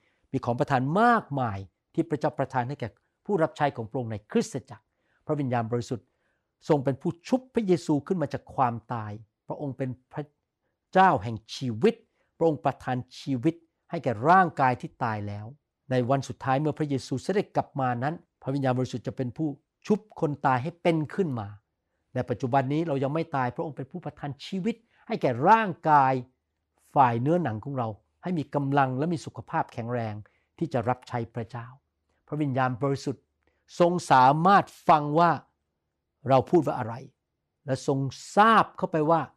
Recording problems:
none

